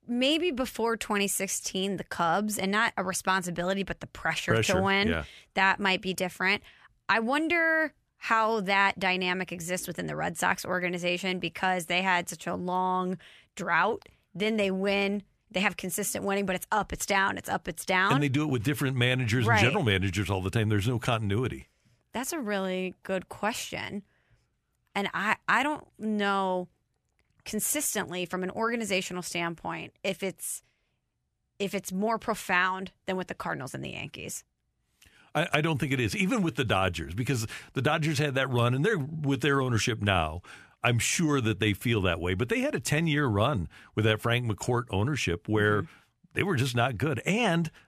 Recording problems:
none

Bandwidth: 14.5 kHz